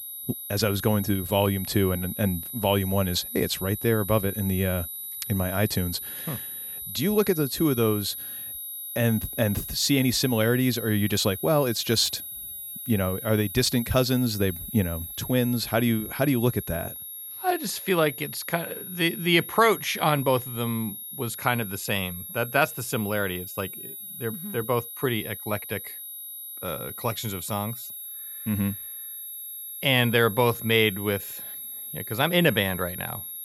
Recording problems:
high-pitched whine; loud; throughout; 11.5 kHz, 9 dB below the speech

